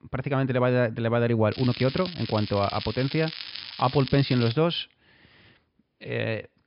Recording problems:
high frequencies cut off; noticeable; nothing above 5.5 kHz
crackling; noticeable; from 1.5 to 4.5 s; 10 dB below the speech

